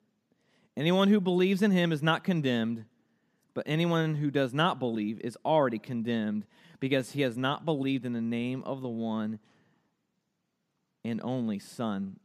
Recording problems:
none

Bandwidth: 14.5 kHz